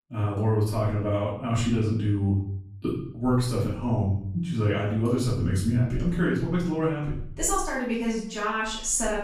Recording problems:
off-mic speech; far
room echo; noticeable; dies away in 0.6 s

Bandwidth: 14.5 kHz